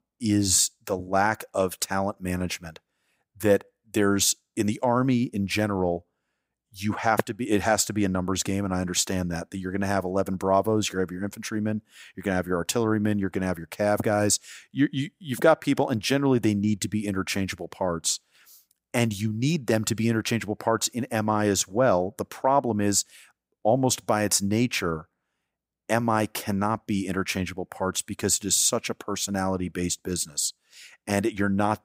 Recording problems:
none

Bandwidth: 15.5 kHz